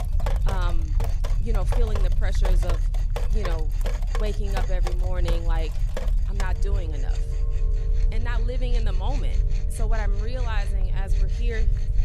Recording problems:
rain or running water; loud; throughout; 5 dB below the speech
machinery noise; noticeable; throughout; 15 dB below the speech
low rumble; noticeable; throughout; 10 dB below the speech

